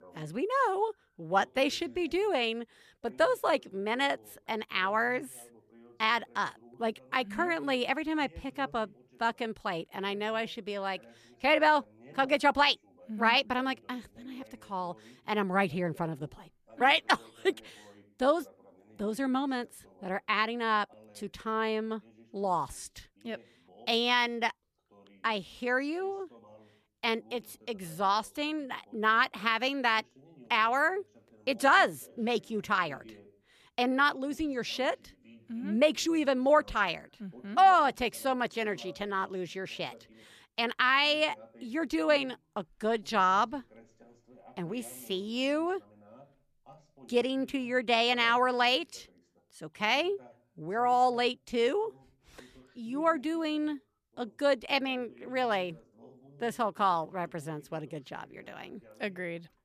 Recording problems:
voice in the background; faint; throughout; 30 dB below the speech

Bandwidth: 14.5 kHz